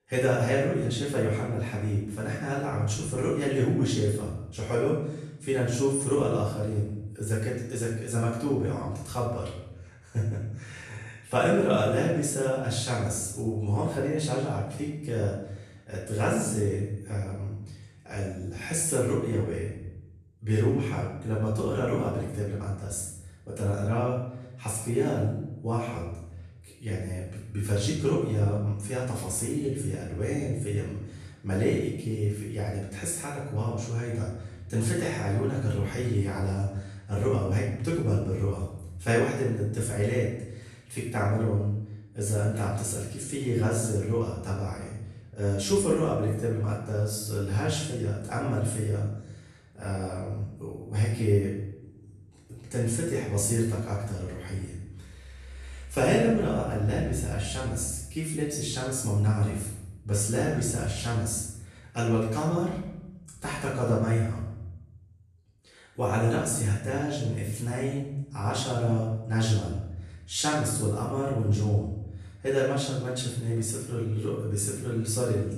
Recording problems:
off-mic speech; far
room echo; noticeable; dies away in 0.8 s

